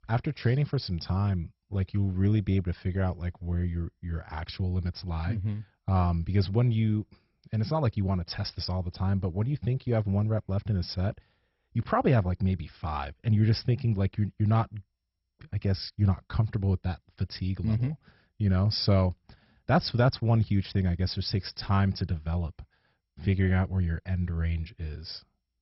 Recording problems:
garbled, watery; badly; nothing above 5.5 kHz

